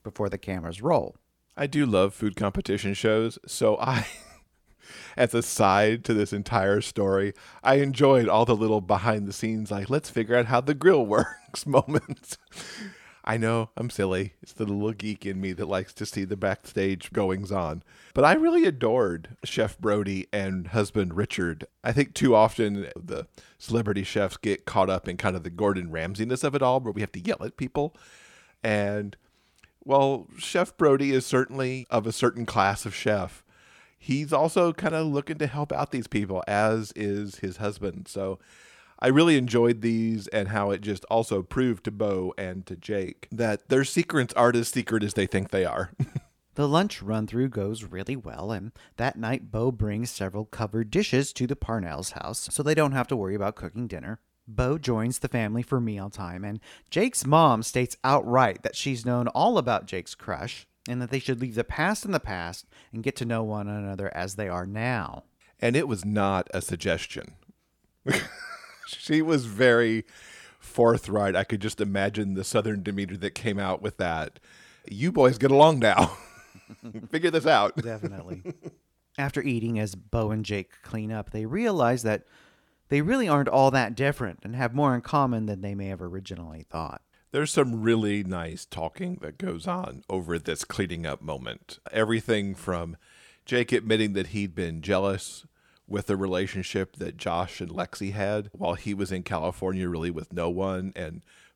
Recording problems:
none

